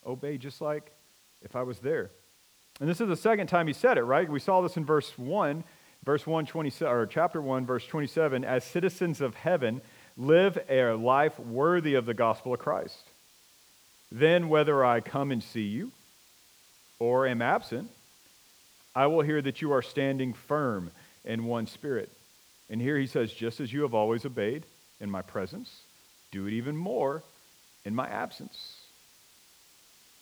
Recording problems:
hiss; faint; throughout; 30 dB below the speech

